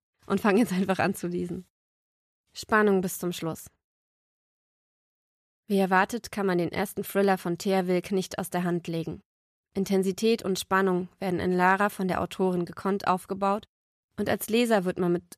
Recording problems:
none

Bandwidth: 14.5 kHz